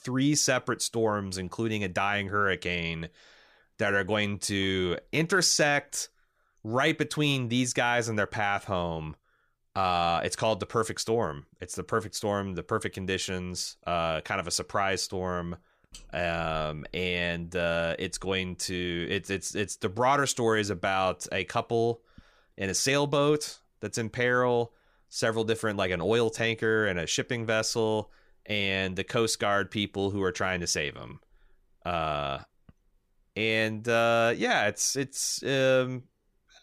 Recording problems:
none

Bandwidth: 15 kHz